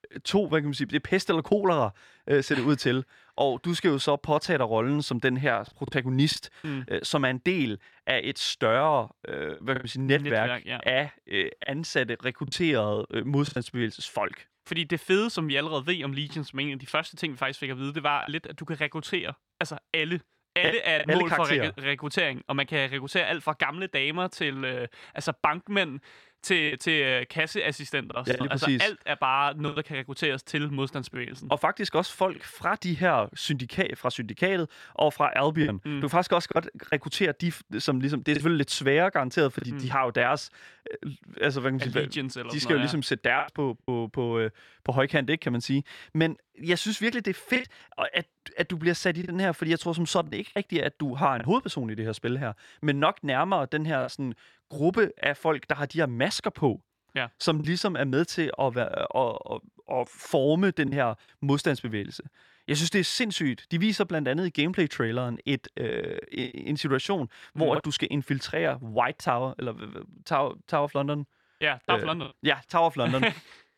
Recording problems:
choppy; occasionally; 3% of the speech affected

